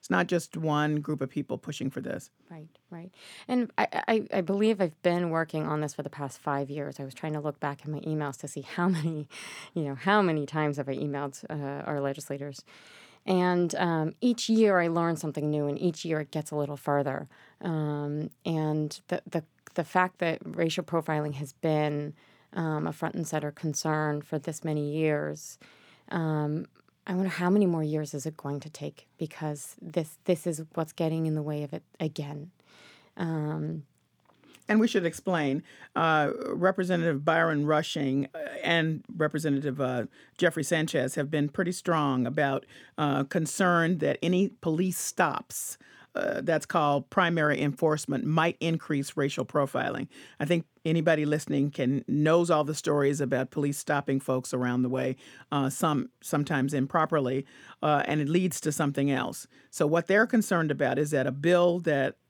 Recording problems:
none

